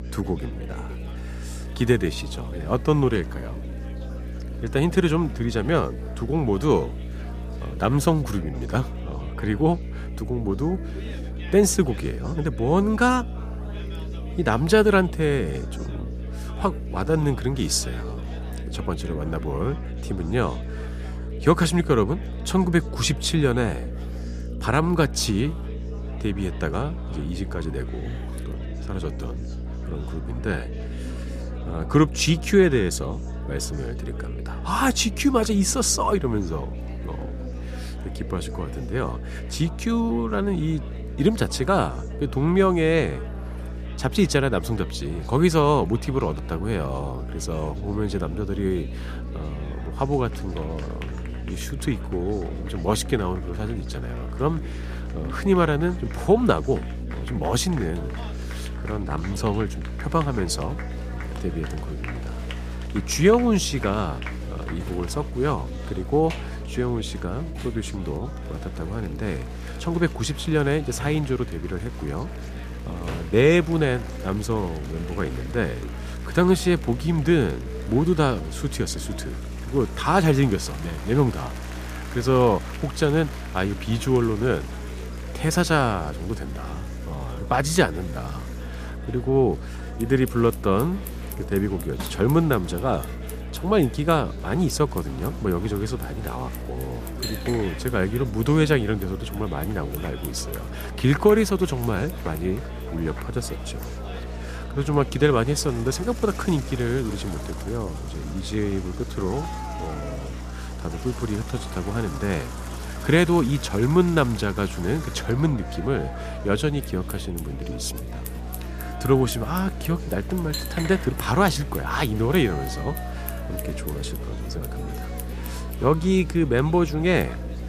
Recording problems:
electrical hum; noticeable; throughout; 60 Hz, 20 dB below the speech
household noises; noticeable; throughout; 20 dB below the speech
chatter from many people; noticeable; throughout; 20 dB below the speech

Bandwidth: 14.5 kHz